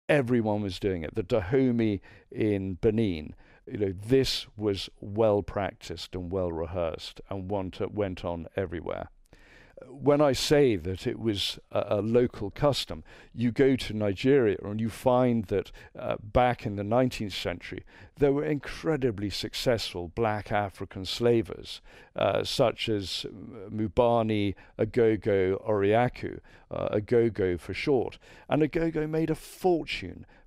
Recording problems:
none

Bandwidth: 15.5 kHz